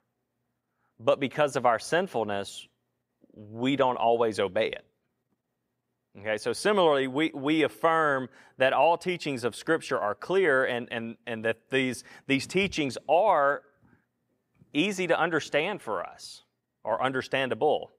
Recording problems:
none

